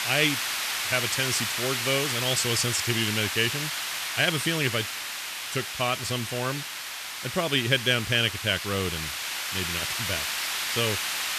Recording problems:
hiss; loud; throughout; 2 dB below the speech

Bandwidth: 14.5 kHz